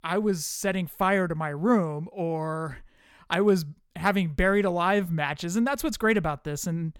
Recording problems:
none

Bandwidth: 18 kHz